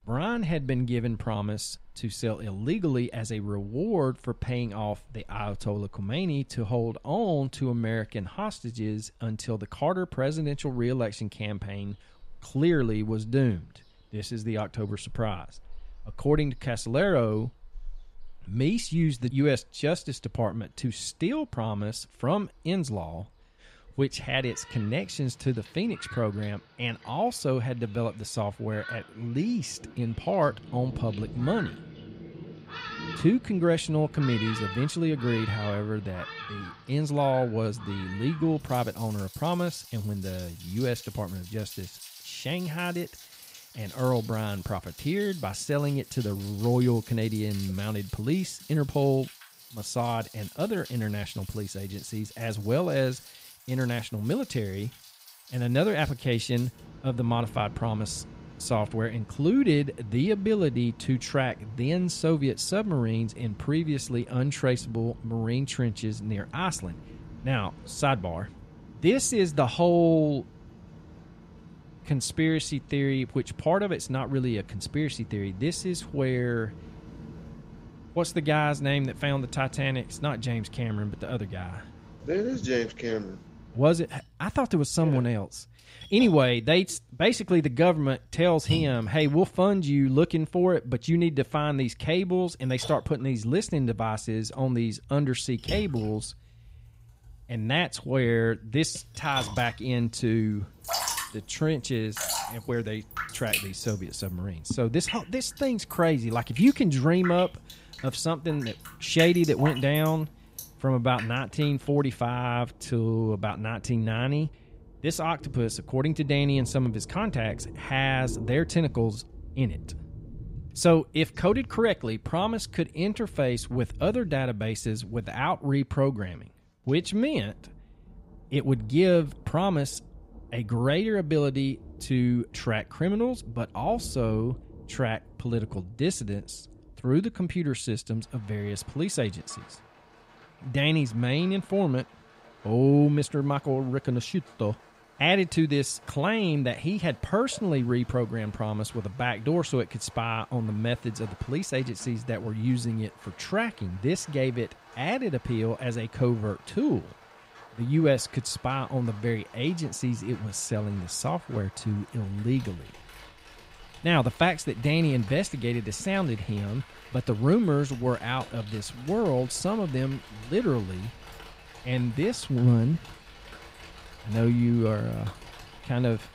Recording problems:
rain or running water; noticeable; throughout; 15 dB below the speech

